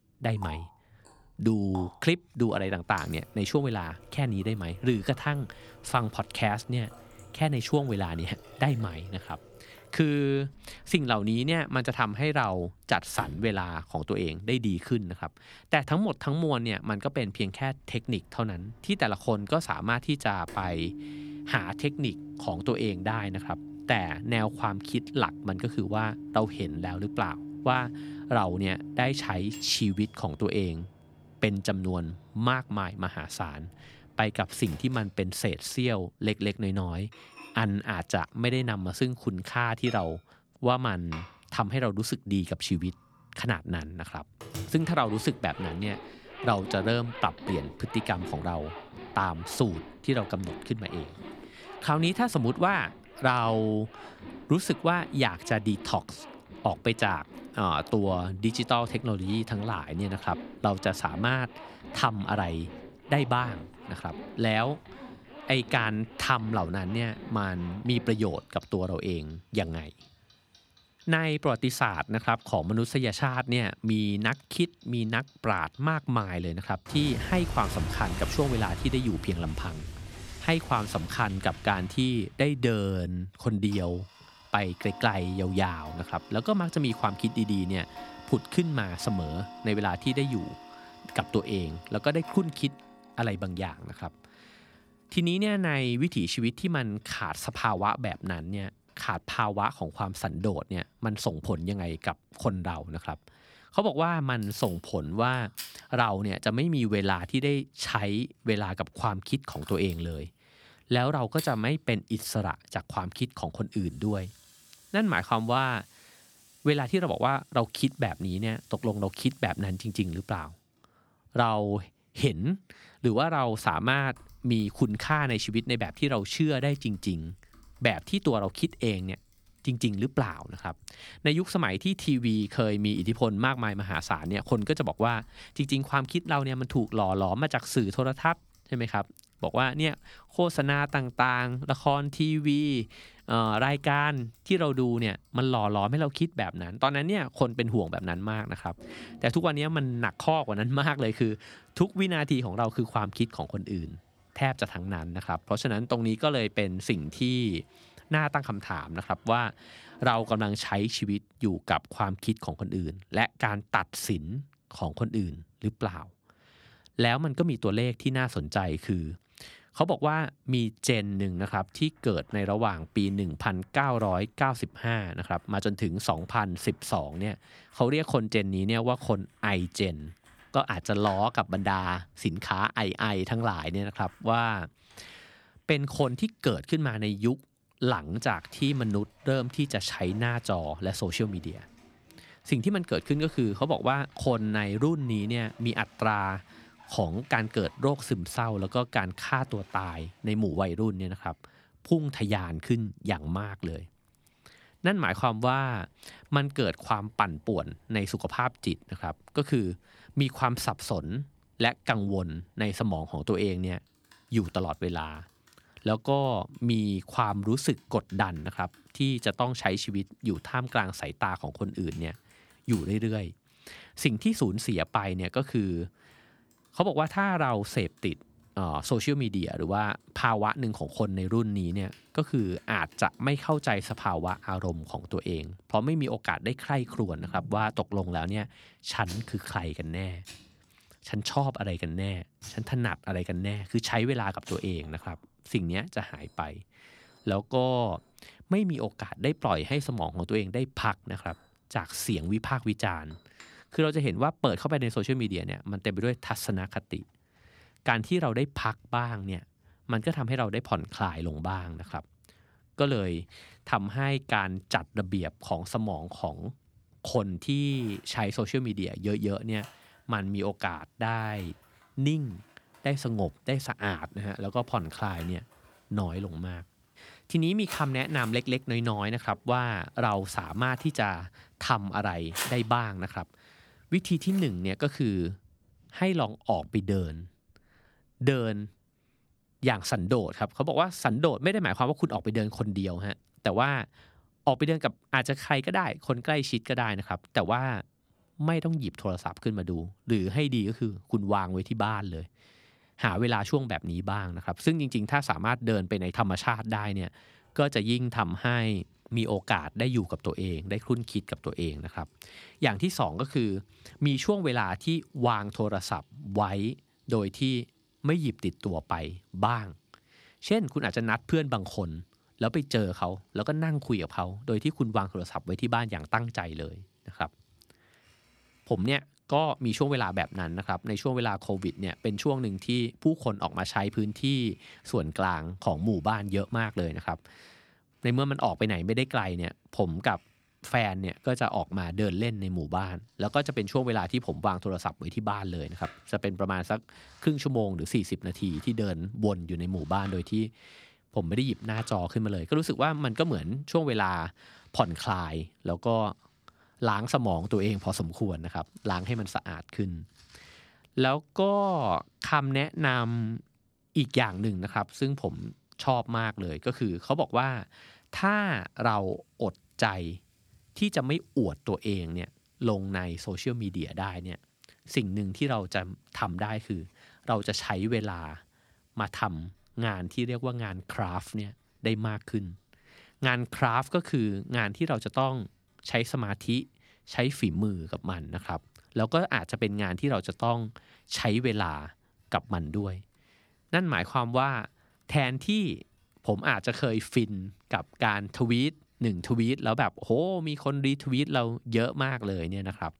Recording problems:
household noises; noticeable; throughout; 15 dB below the speech

